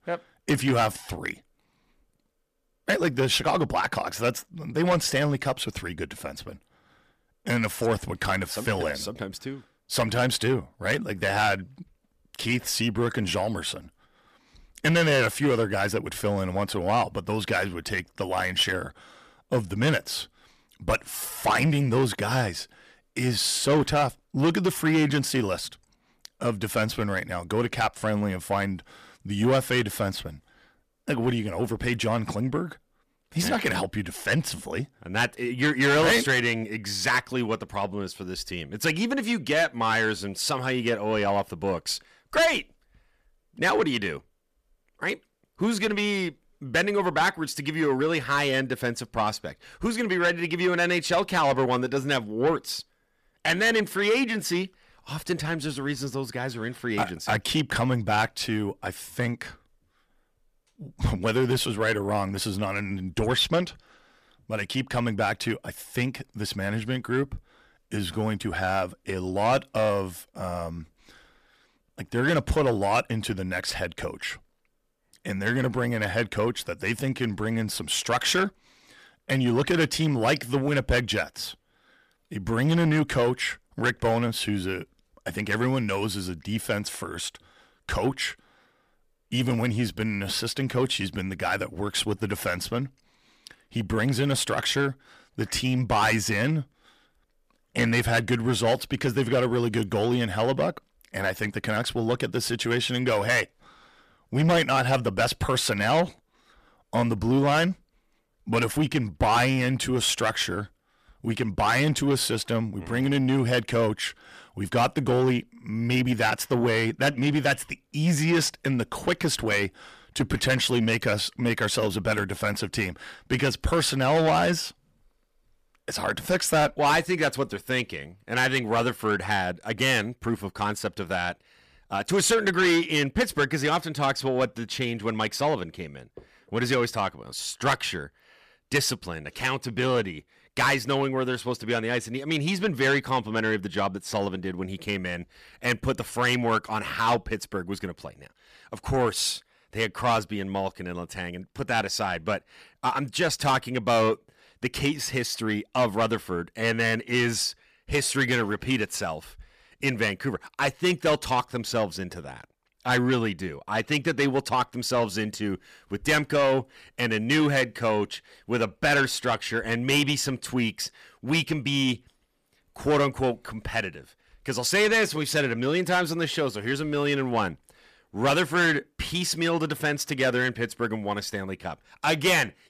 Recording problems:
distortion; heavy; 8 dB below the speech

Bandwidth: 14.5 kHz